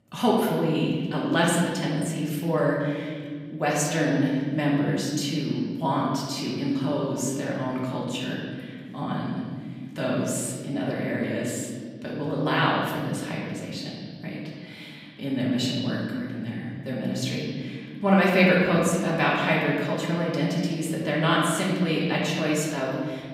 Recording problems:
off-mic speech; far
room echo; noticeable; dies away in 2 s

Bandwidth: 15.5 kHz